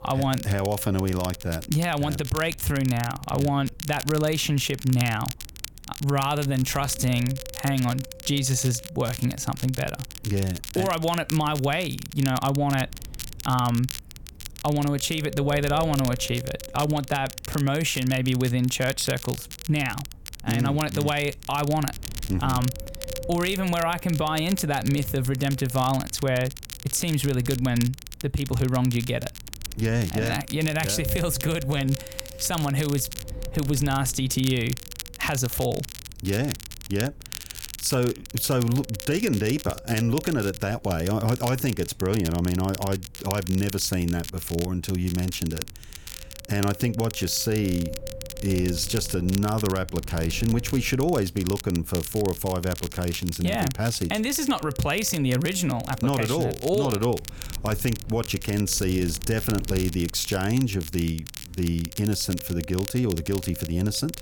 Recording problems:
wind noise on the microphone; occasional gusts; 15 dB below the speech
crackle, like an old record; noticeable; 10 dB below the speech

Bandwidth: 18 kHz